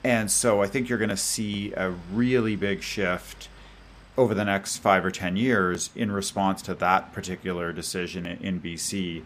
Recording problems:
train or aircraft noise; faint; throughout; 25 dB below the speech

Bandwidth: 15 kHz